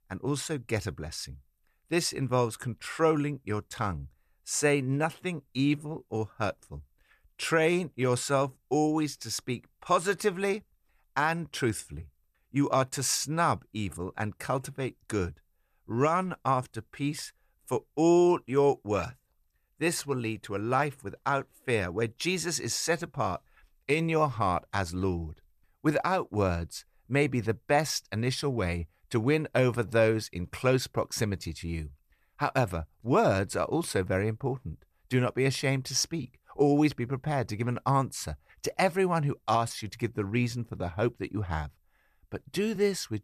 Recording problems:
none

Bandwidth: 14.5 kHz